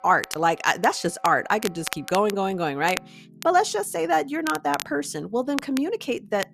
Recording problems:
crackle, like an old record; noticeable; 10 dB below the speech
background music; faint; throughout; 25 dB below the speech

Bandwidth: 14 kHz